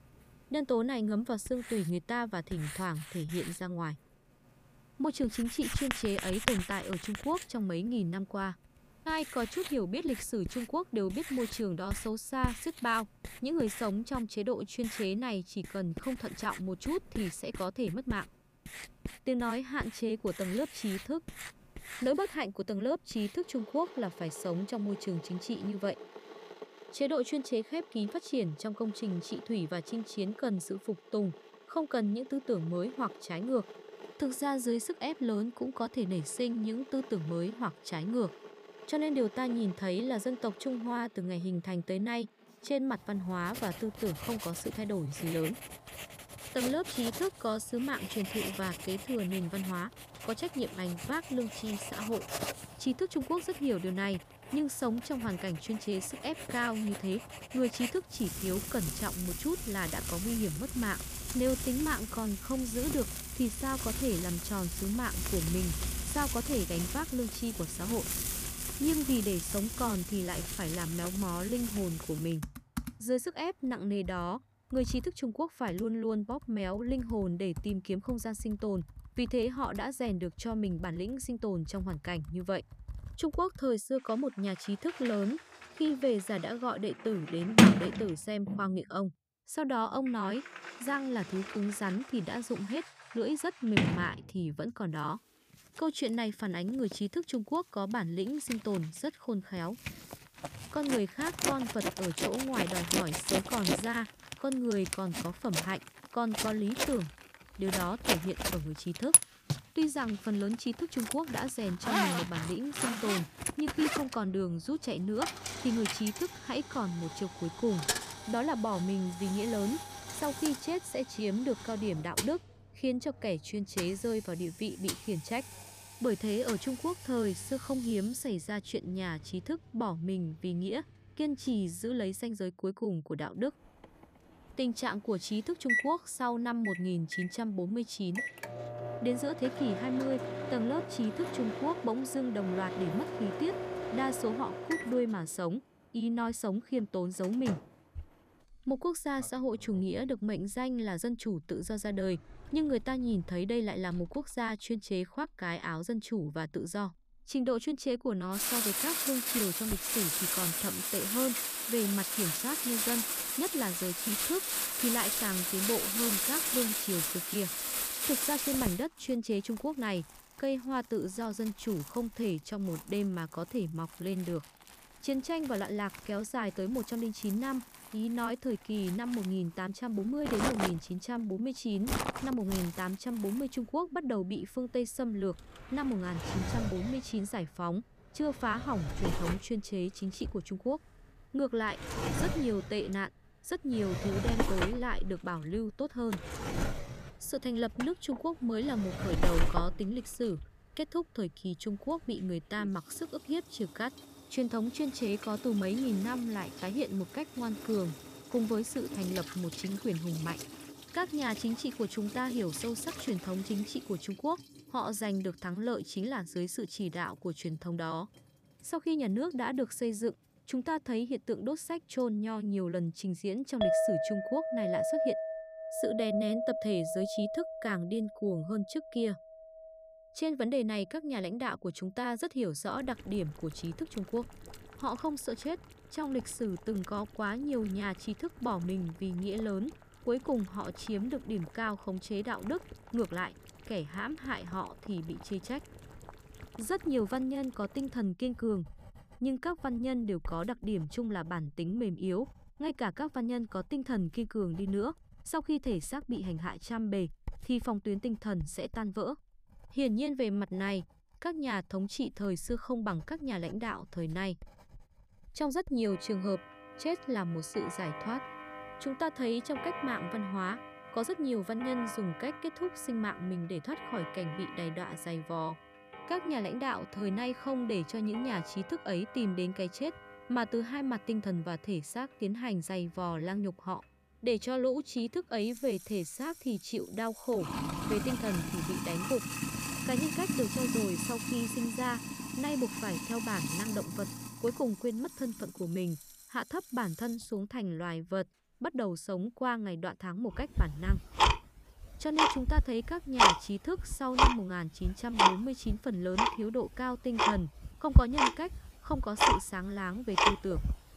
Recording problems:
household noises; loud; throughout; as loud as the speech

